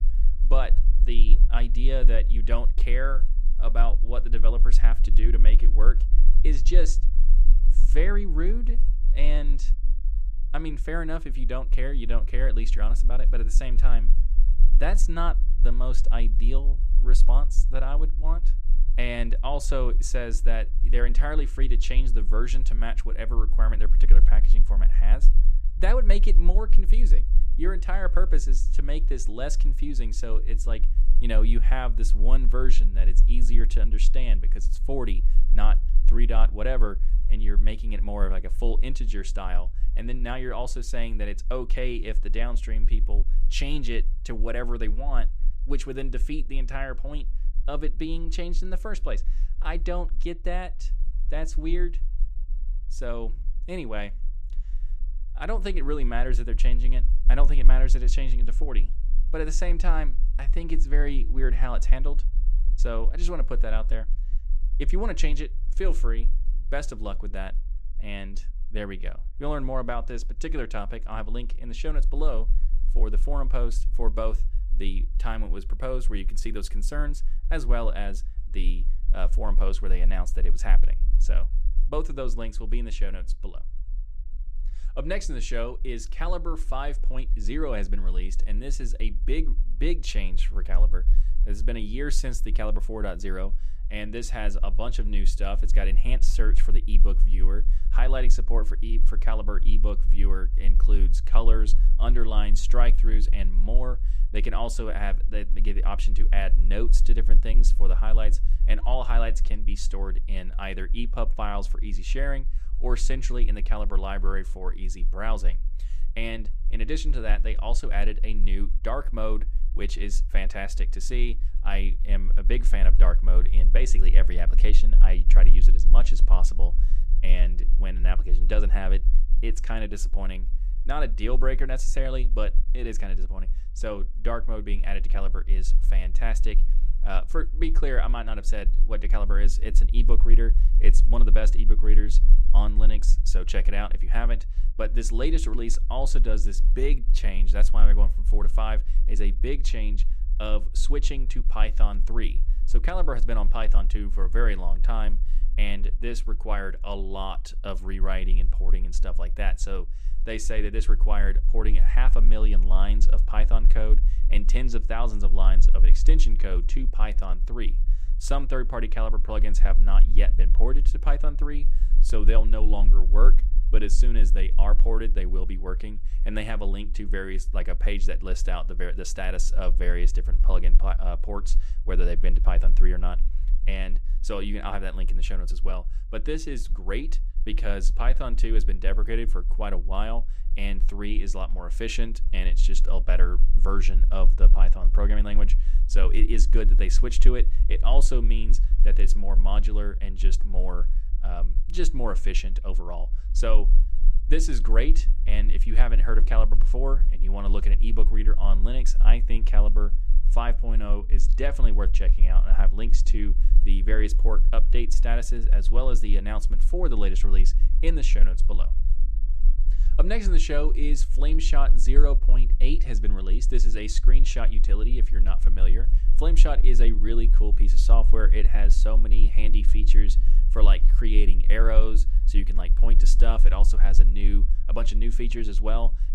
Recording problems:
low rumble; noticeable; throughout; 20 dB below the speech

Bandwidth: 15 kHz